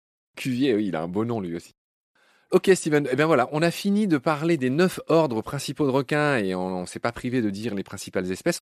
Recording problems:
none

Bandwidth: 14.5 kHz